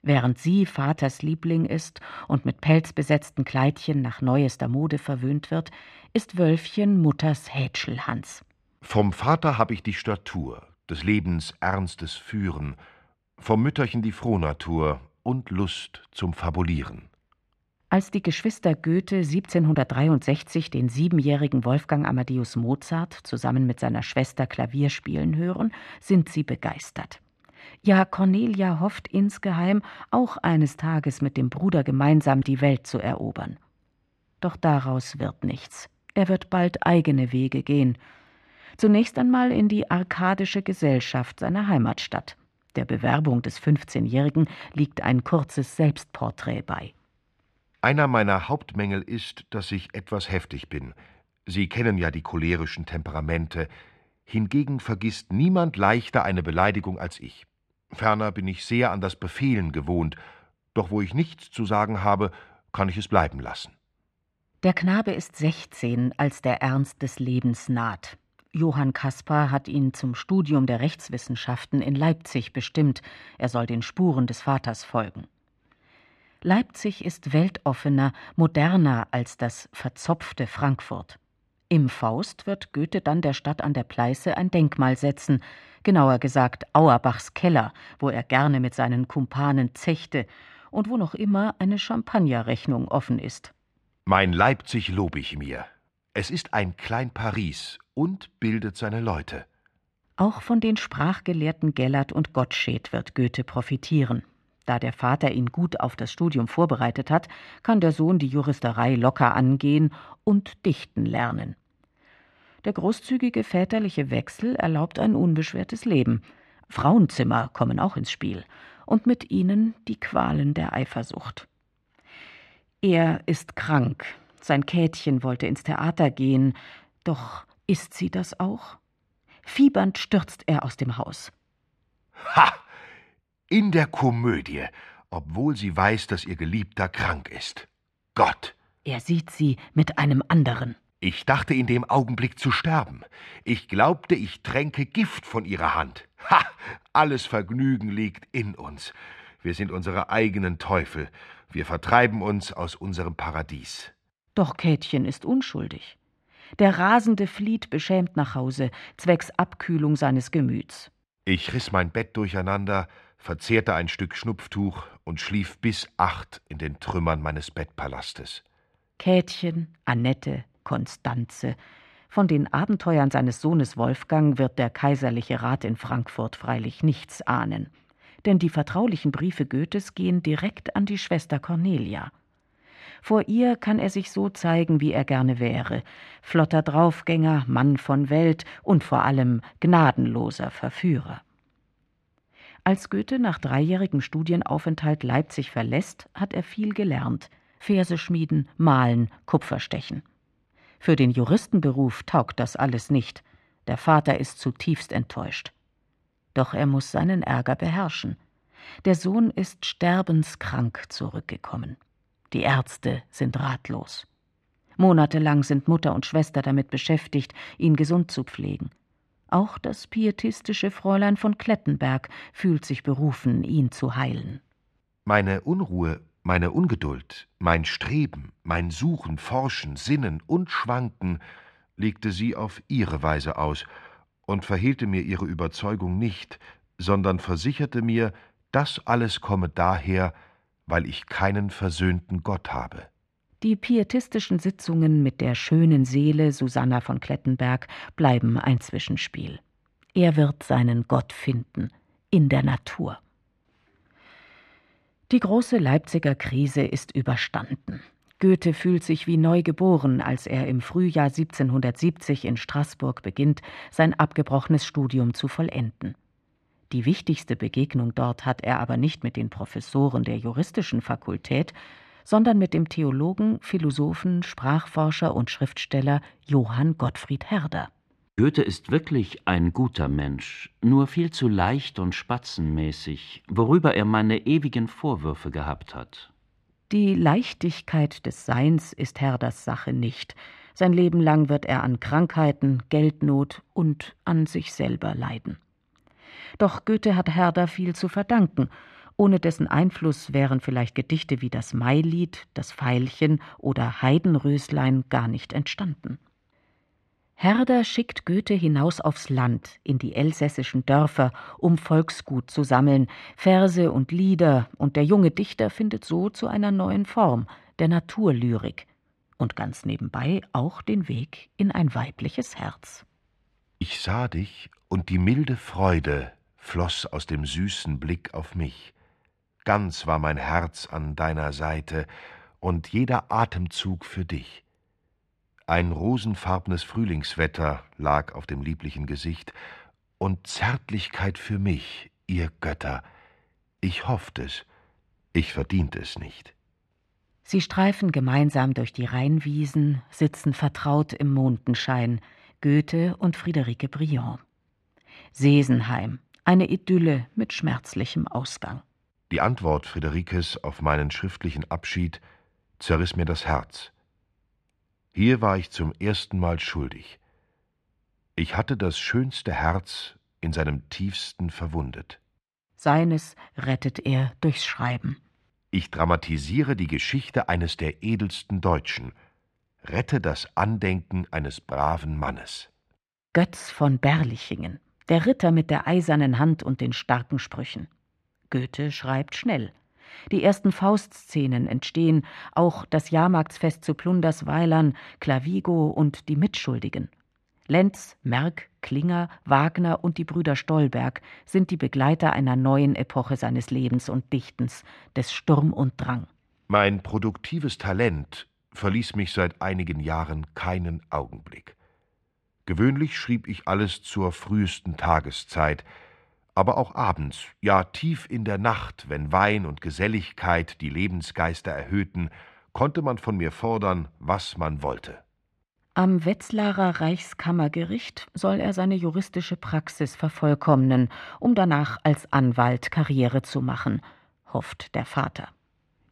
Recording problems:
muffled; slightly; fading above 2.5 kHz

